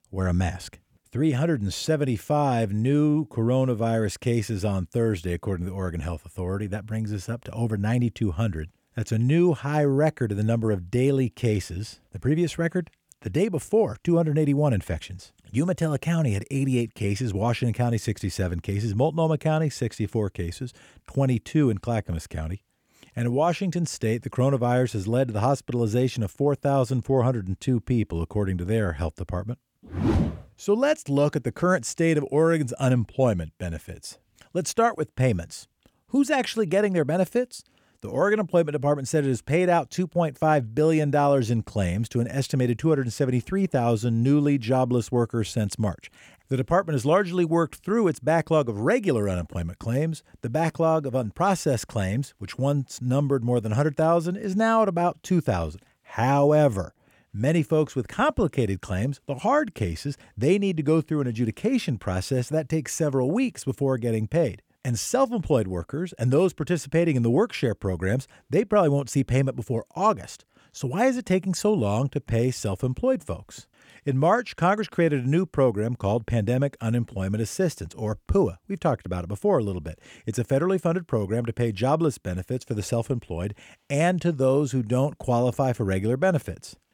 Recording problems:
none

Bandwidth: 18 kHz